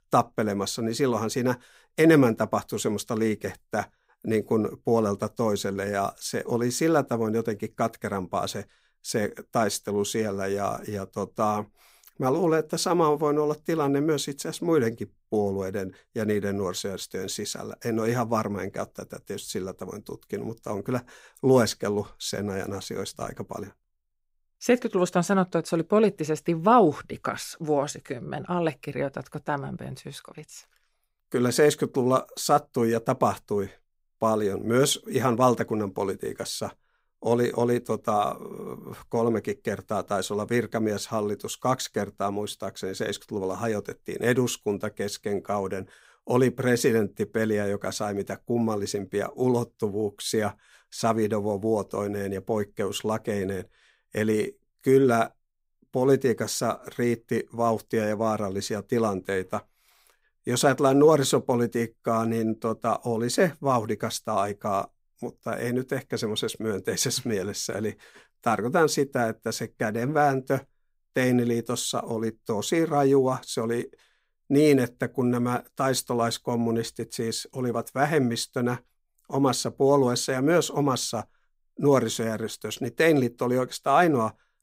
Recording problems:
none

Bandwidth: 15.5 kHz